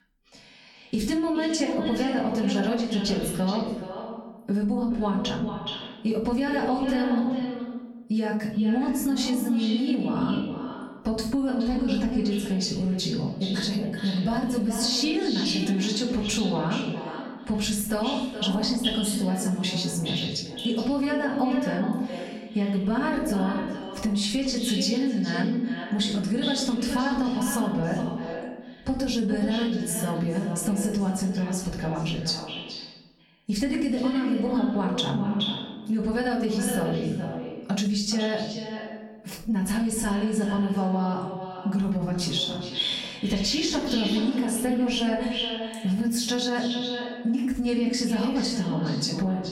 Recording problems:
echo of what is said; strong; throughout; 420 ms later, 7 dB below the speech
off-mic speech; far
room echo; slight; dies away in 0.6 s
squashed, flat; somewhat

